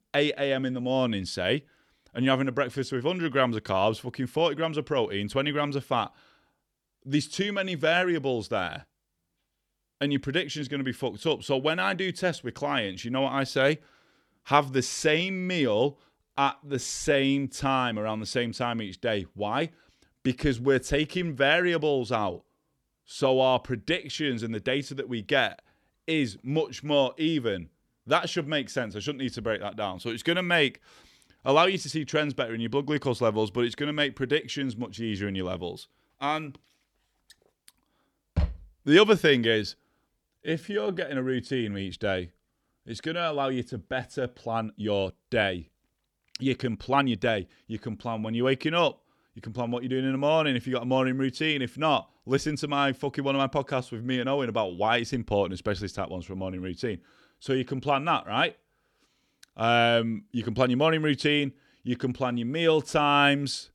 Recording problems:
uneven, jittery; strongly; from 16 to 47 s

